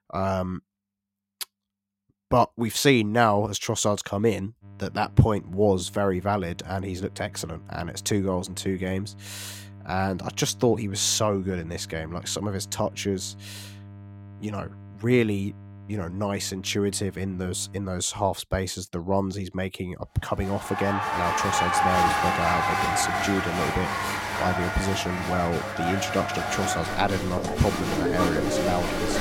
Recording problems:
crowd noise; very loud; from 21 s on; 1 dB above the speech
electrical hum; faint; from 4.5 to 18 s and from 22 s on; 50 Hz, 25 dB below the speech

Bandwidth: 16.5 kHz